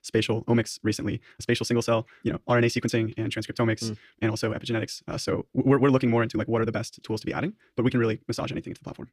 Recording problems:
wrong speed, natural pitch; too fast; 1.6 times normal speed

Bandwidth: 14.5 kHz